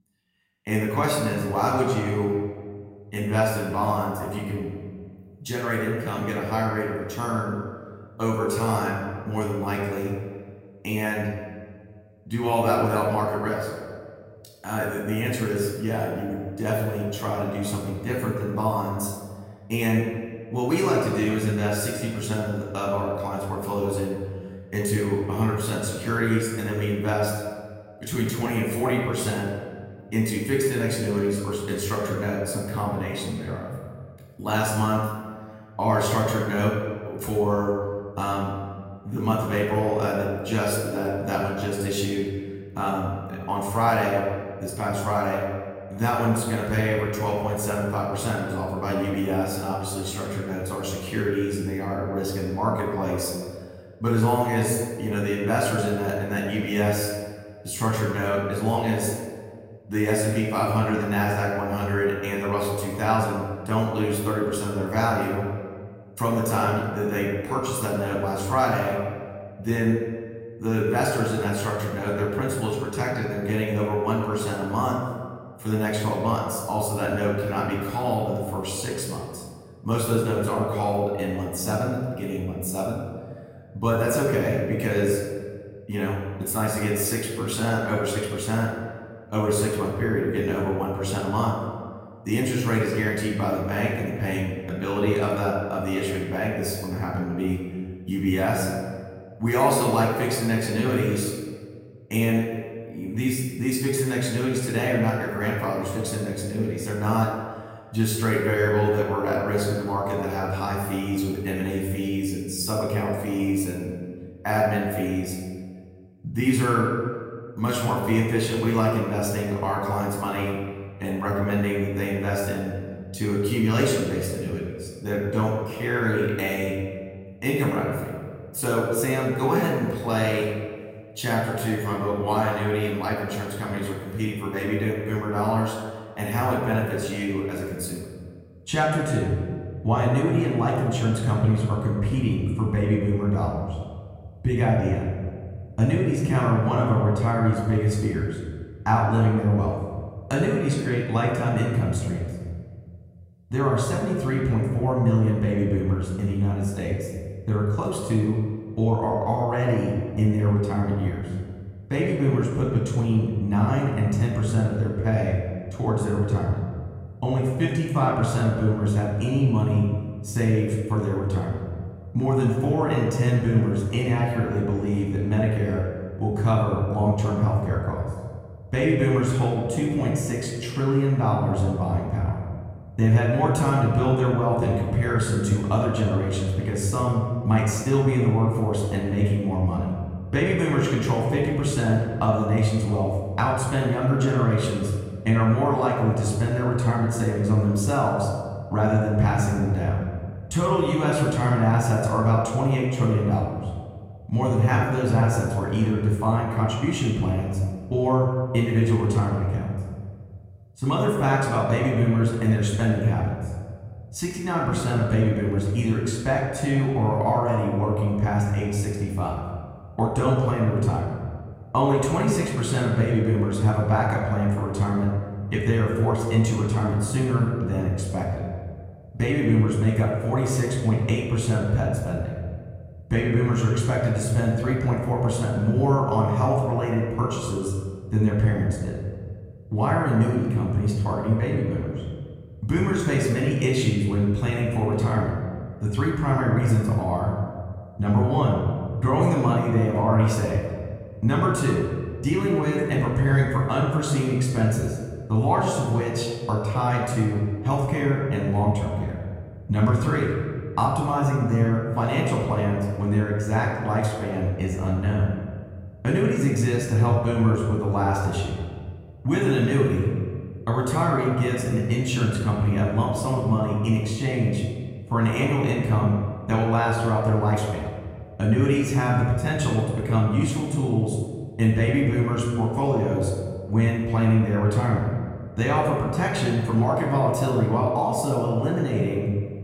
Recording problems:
off-mic speech; far
room echo; noticeable; dies away in 1.5 s

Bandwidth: 16 kHz